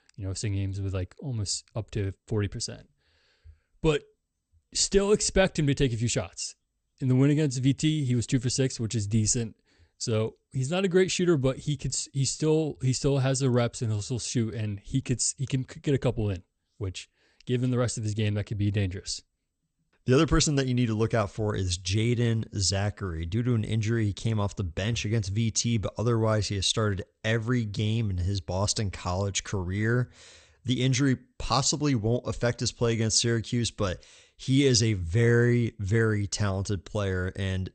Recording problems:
garbled, watery; slightly; nothing above 8.5 kHz

